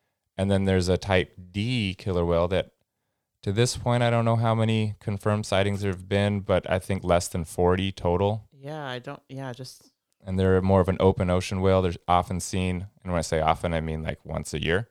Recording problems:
none

